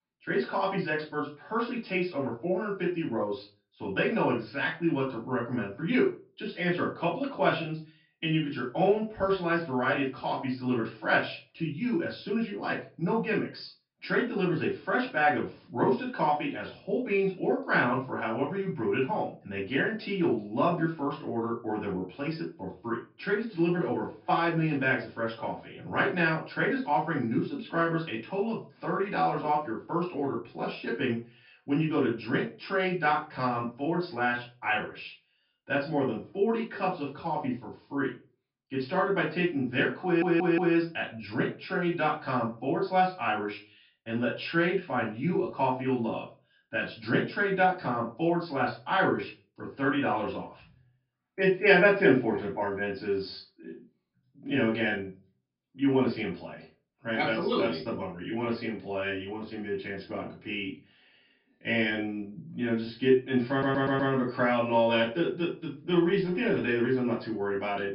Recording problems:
off-mic speech; far
high frequencies cut off; noticeable; nothing above 5.5 kHz
room echo; slight; dies away in 0.3 s
audio stuttering; at 40 s and at 1:04

